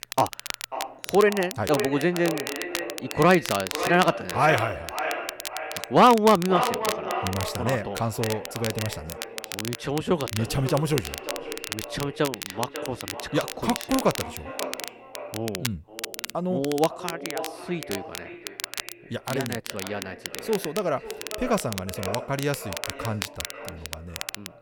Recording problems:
echo of what is said; strong; throughout; 540 ms later, 9 dB below the speech
crackle, like an old record; loud; 9 dB below the speech

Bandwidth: 17.5 kHz